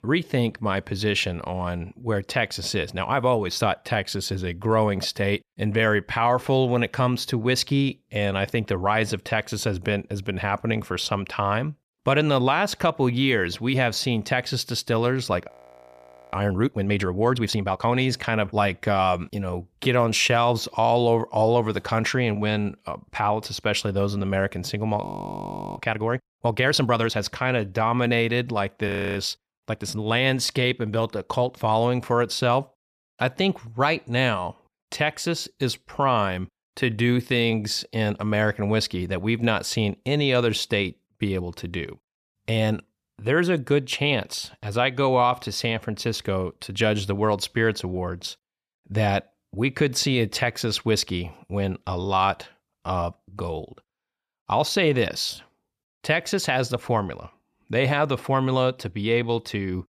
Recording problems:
audio freezing; at 15 s for 1 s, at 25 s for 0.5 s and at 29 s

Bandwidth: 14.5 kHz